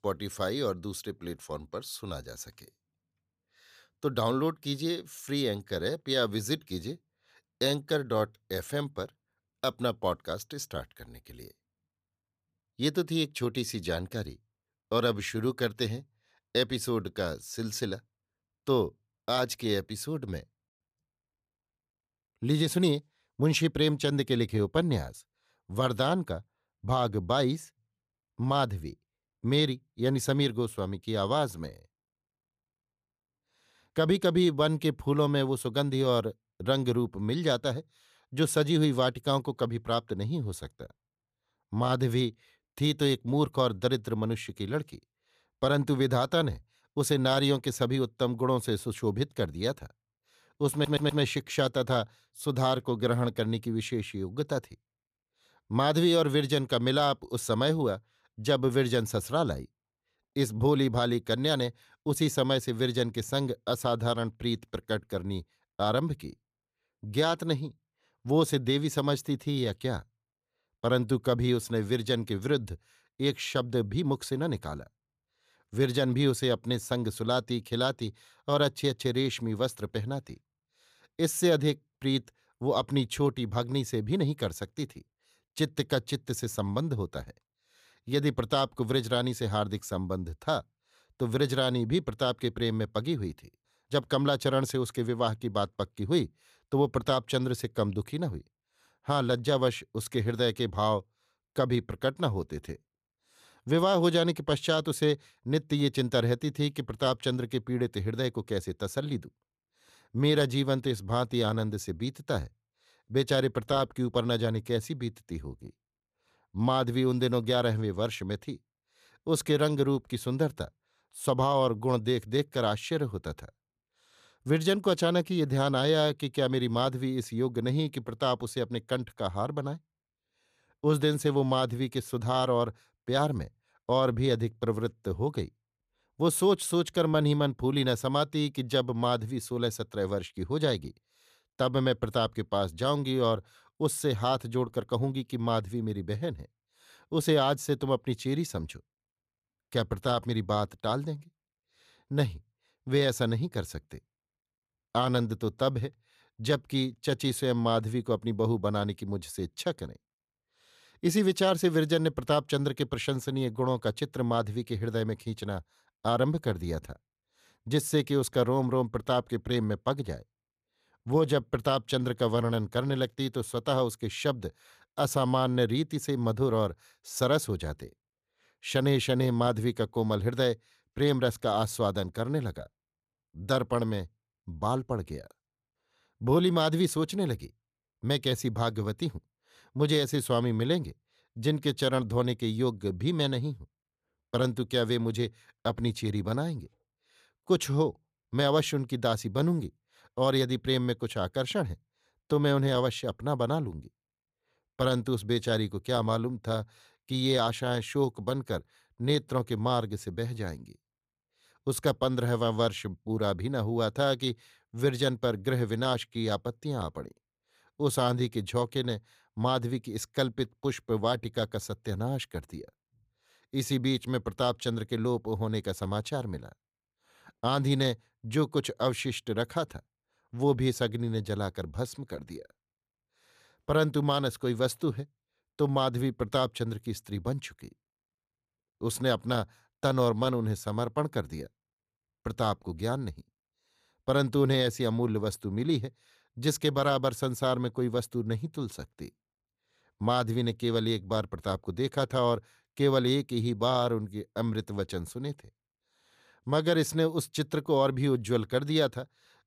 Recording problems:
audio stuttering; at 51 s

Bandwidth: 14.5 kHz